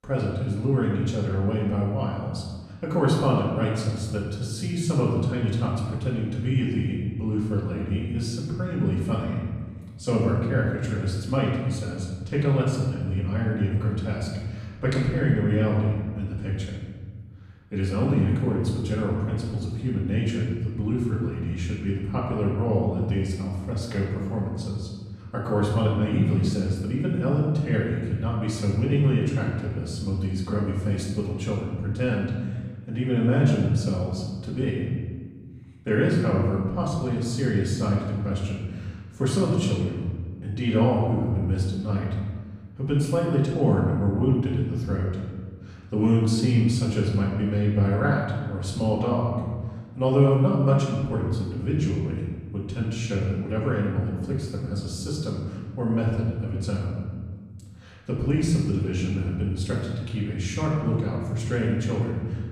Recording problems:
off-mic speech; far
room echo; noticeable; dies away in 1.5 s

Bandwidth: 14.5 kHz